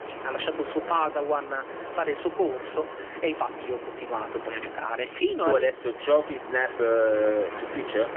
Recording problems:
phone-call audio; poor line; nothing above 3 kHz
wind in the background; noticeable; throughout; 10 dB below the speech
wind noise on the microphone; occasional gusts; 15 dB below the speech
uneven, jittery; strongly; from 1 to 7.5 s

